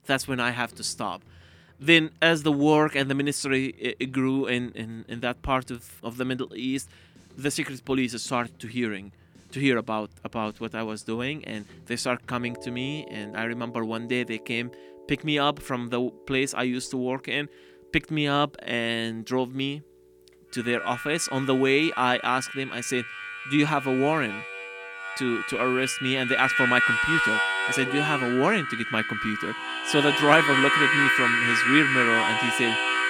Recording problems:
background music; very loud; throughout; 1 dB above the speech

